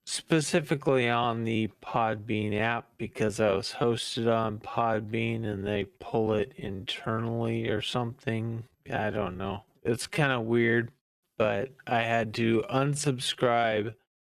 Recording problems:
wrong speed, natural pitch; too slow; 0.6 times normal speed

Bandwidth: 14.5 kHz